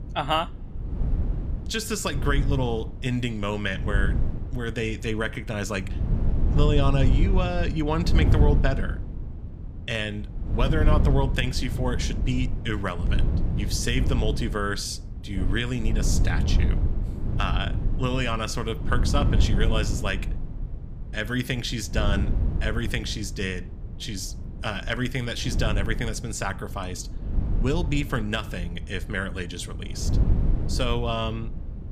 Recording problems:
wind noise on the microphone; occasional gusts; 10 dB below the speech

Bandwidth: 15 kHz